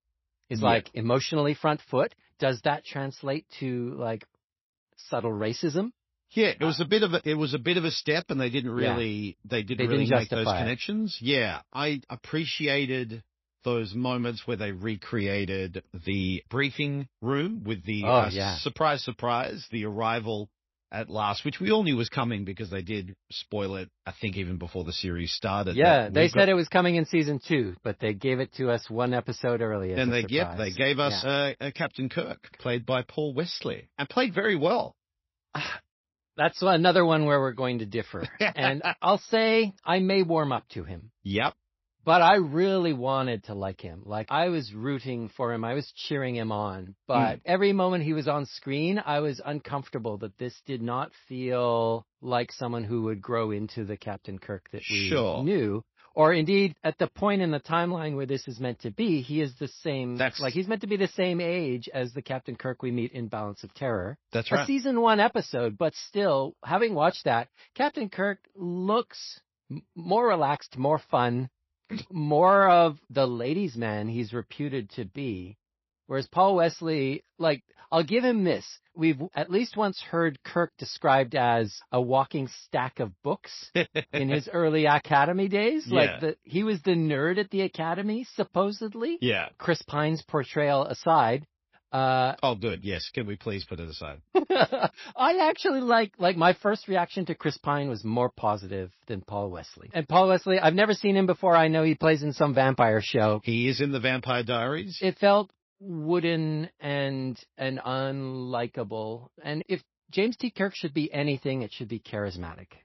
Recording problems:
garbled, watery; slightly; nothing above 5.5 kHz

